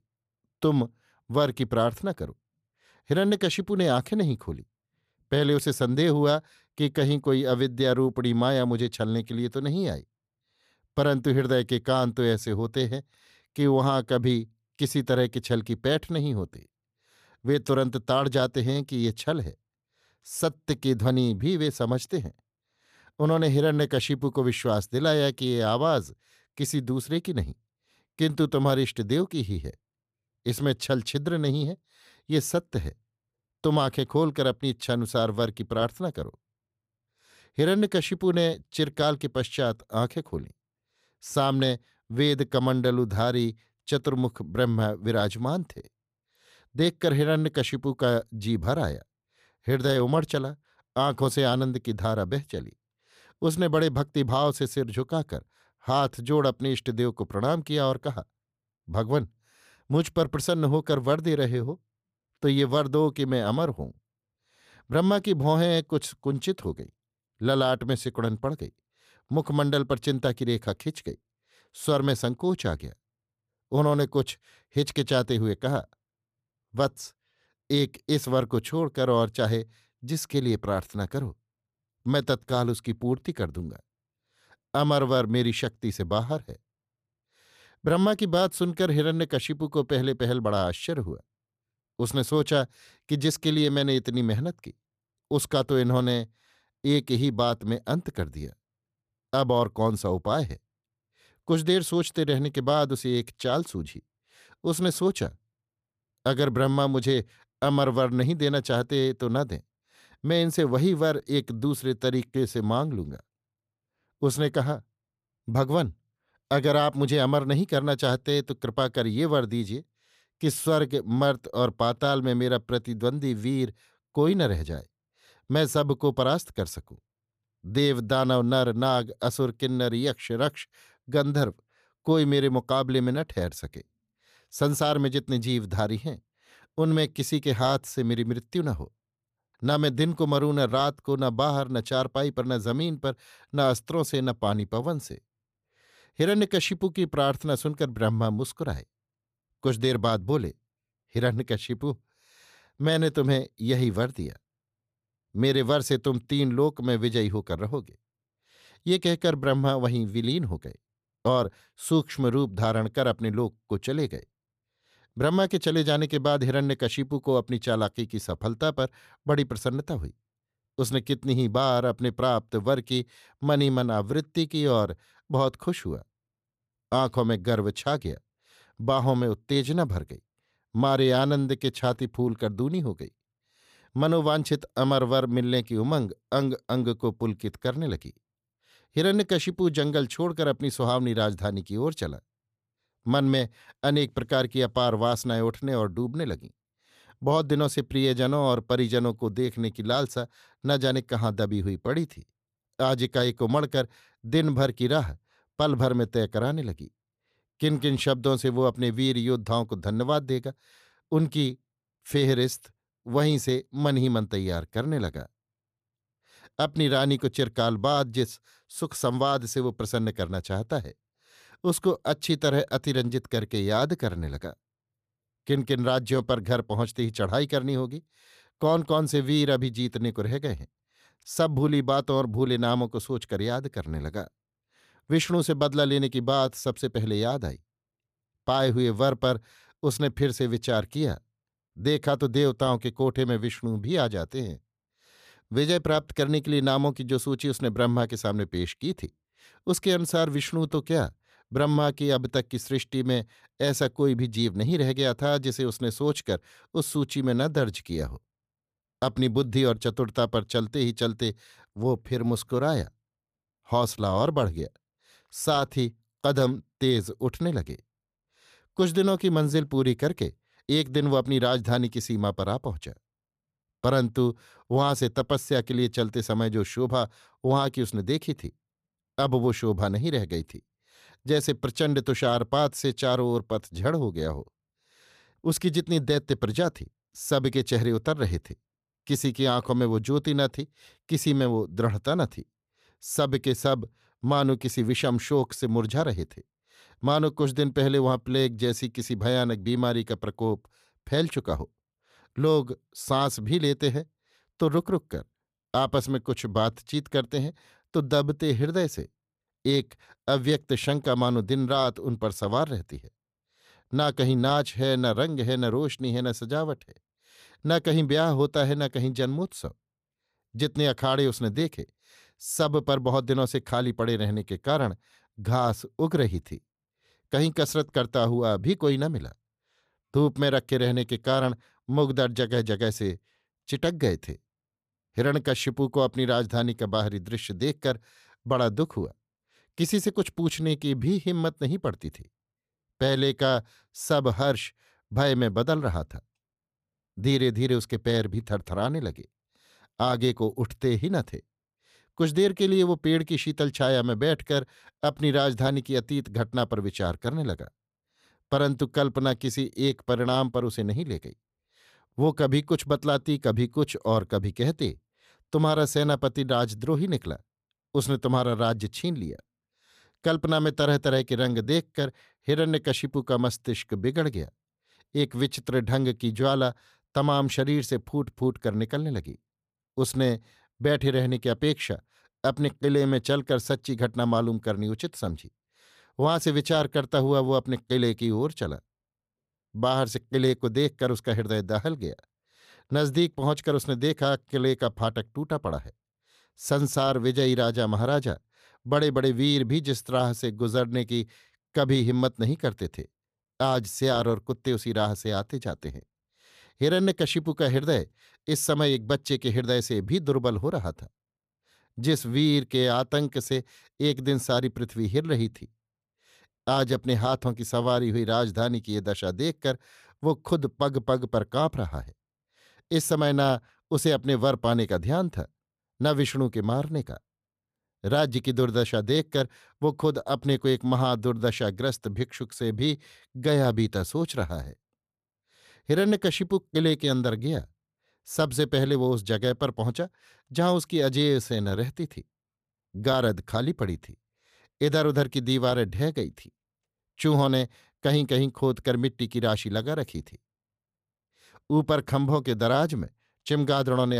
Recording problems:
abrupt cut into speech; at the end

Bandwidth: 14.5 kHz